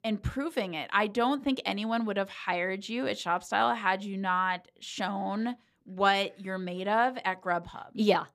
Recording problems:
none

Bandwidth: 14.5 kHz